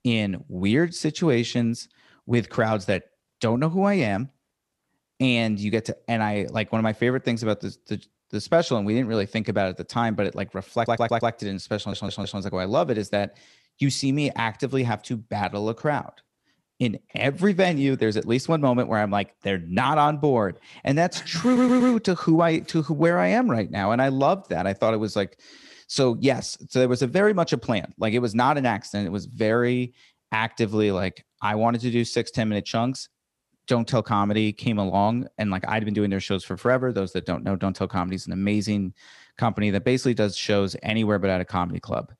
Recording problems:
audio stuttering; at 11 s, at 12 s and at 21 s

